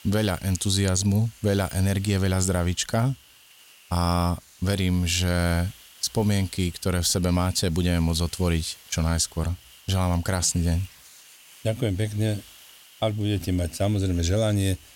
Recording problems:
hiss; faint; throughout; 25 dB below the speech

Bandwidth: 16.5 kHz